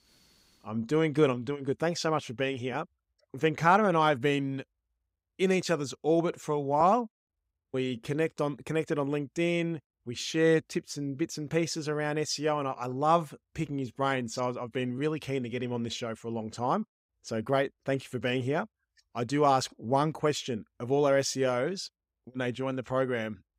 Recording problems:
none

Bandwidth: 15.5 kHz